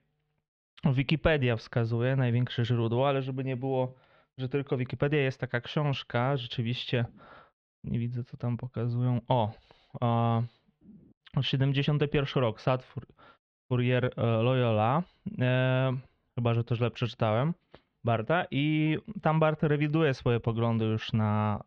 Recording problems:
muffled; very; fading above 3 kHz

